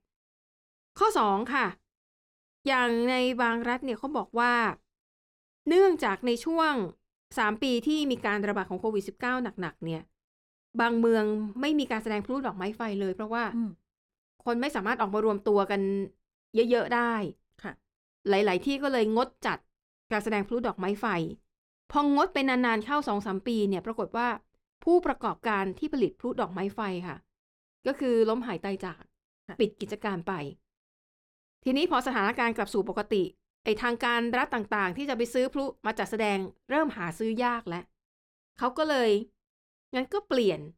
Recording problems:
muffled; very slightly; fading above 2.5 kHz

